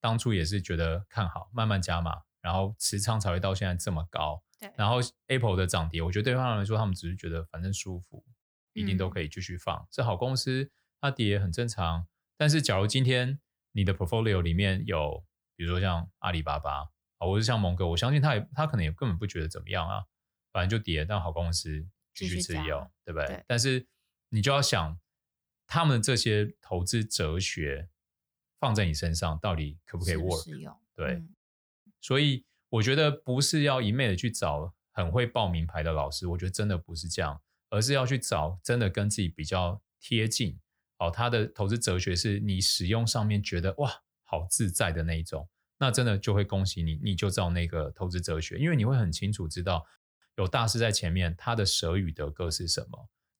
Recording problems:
none

